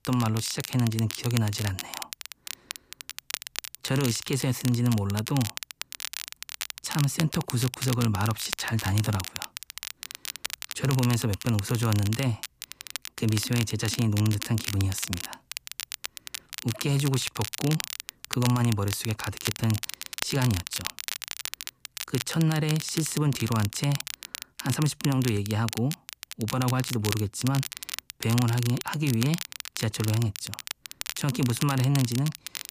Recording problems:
crackle, like an old record; loud; 8 dB below the speech

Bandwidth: 15 kHz